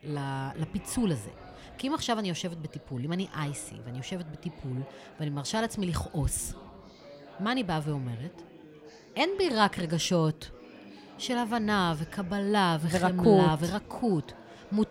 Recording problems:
chatter from many people; faint; throughout; 20 dB below the speech

